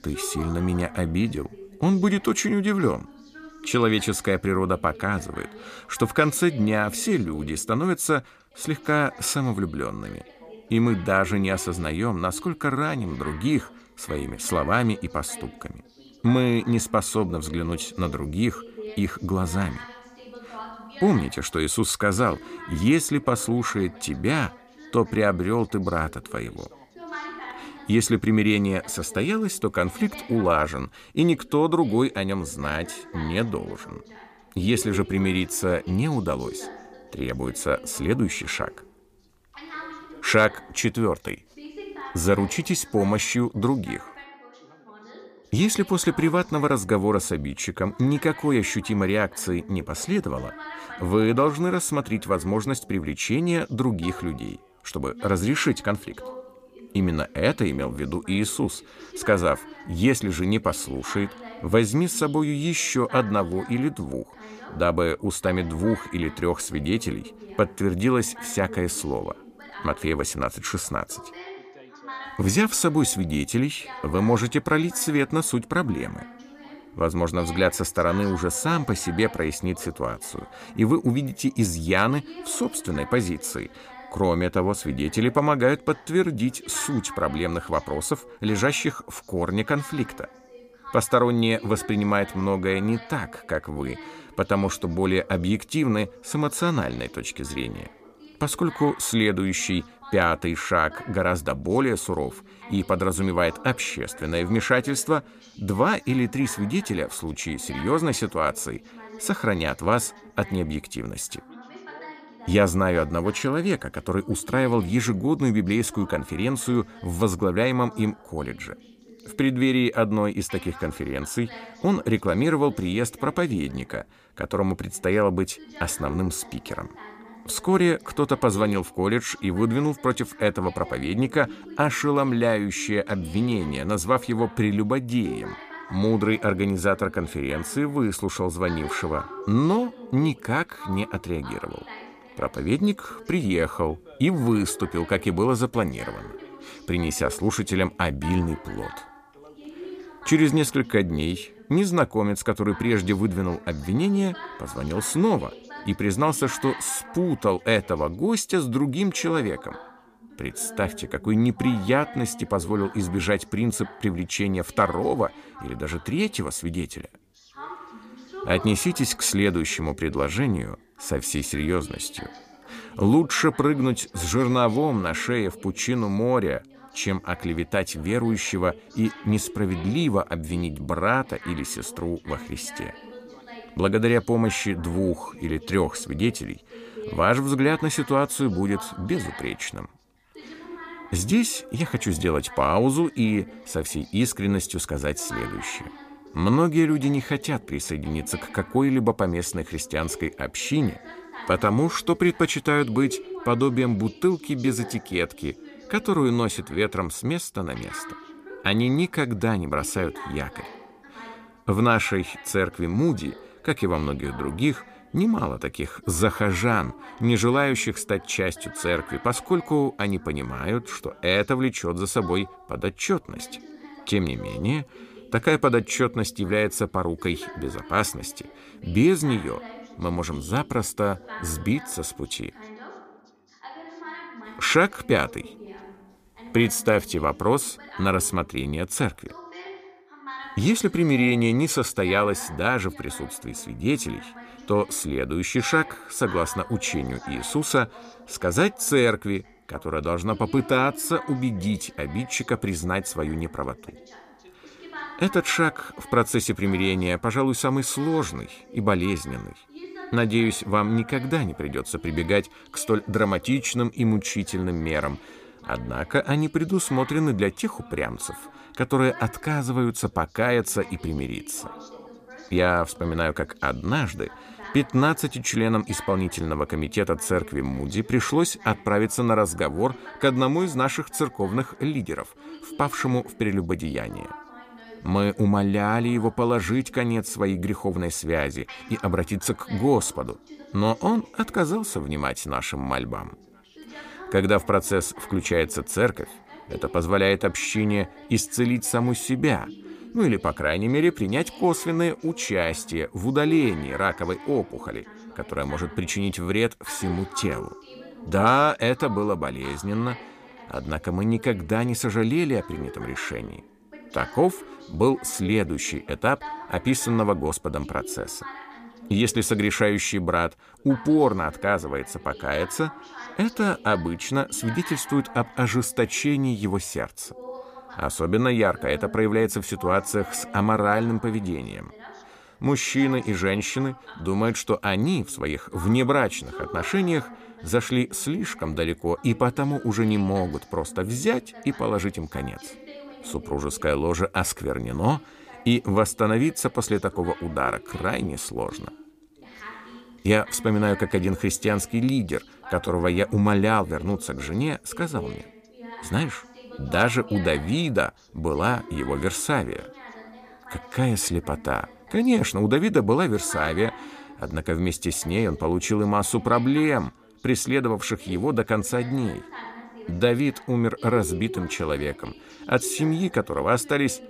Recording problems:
background chatter; noticeable; throughout; 2 voices, 20 dB below the speech

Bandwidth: 15 kHz